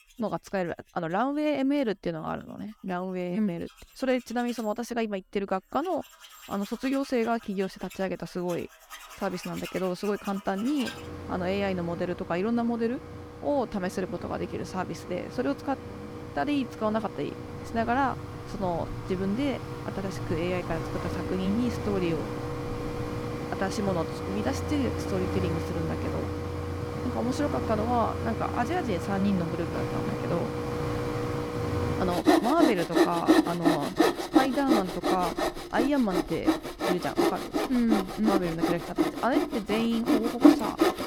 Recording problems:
machinery noise; very loud; throughout; as loud as the speech

